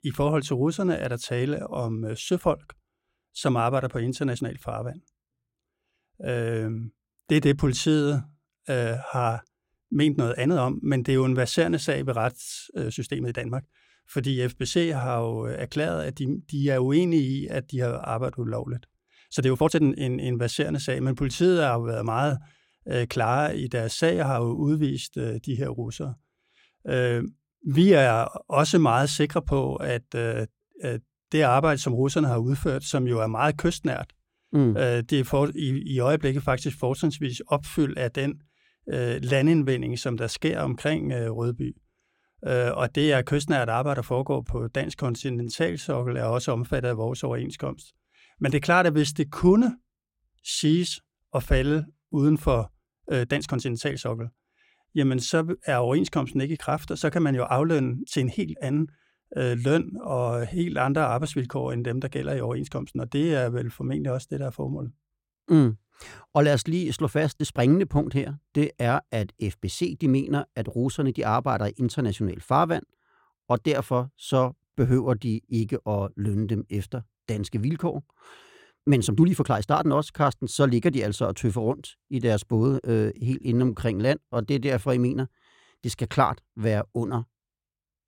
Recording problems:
uneven, jittery; strongly; from 4.5 s to 1:25

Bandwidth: 16.5 kHz